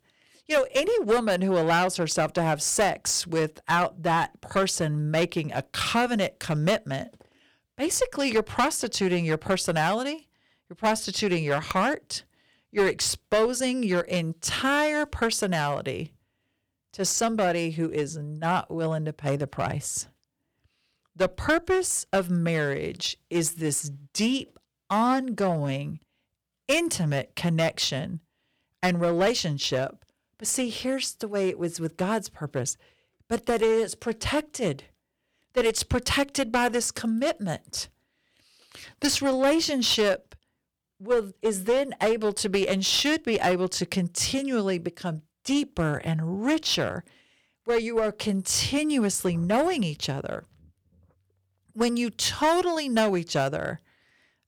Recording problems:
distortion; slight; 5% of the sound clipped

